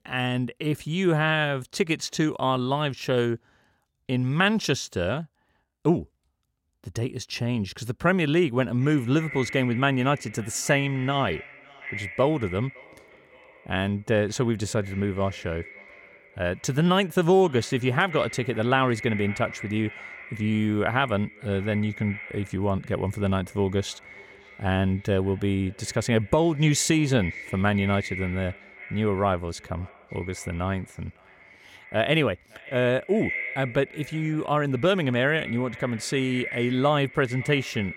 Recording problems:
echo of what is said; noticeable; from 9 s on; 560 ms later, 15 dB below the speech

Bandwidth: 16.5 kHz